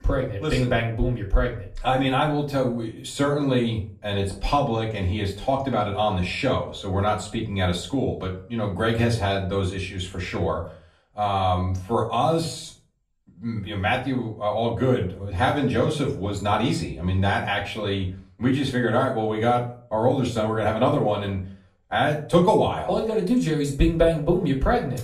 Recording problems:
off-mic speech; far
room echo; slight; dies away in 0.3 s

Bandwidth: 14.5 kHz